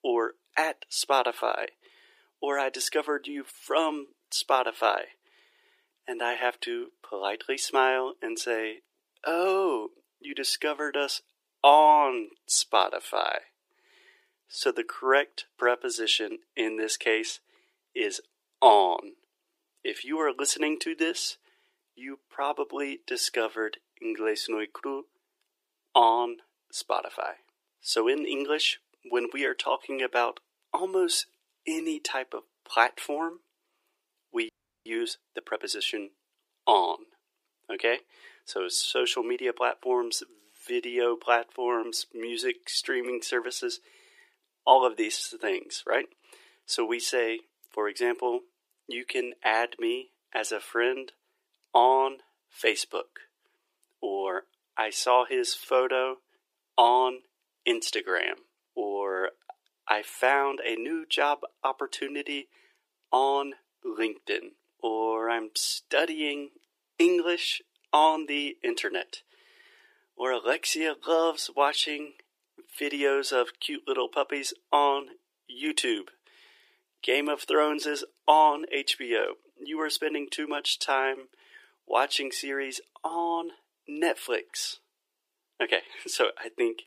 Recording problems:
thin; very; fading below 350 Hz
audio freezing; at 34 s

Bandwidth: 15 kHz